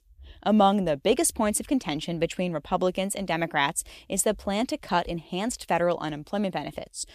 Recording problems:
none

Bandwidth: 14.5 kHz